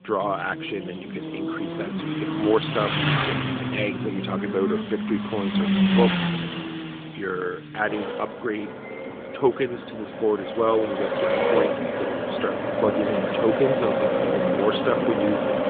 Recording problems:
phone-call audio; nothing above 3.5 kHz
traffic noise; very loud; throughout; 2 dB above the speech

